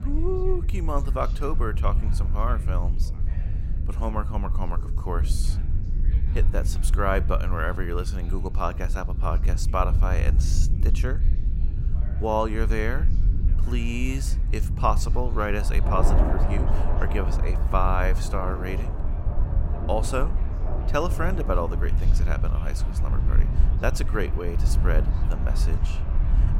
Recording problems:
rain or running water; loud; throughout; 7 dB below the speech
low rumble; noticeable; throughout; 15 dB below the speech
background chatter; faint; throughout; 3 voices, 20 dB below the speech

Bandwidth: 16 kHz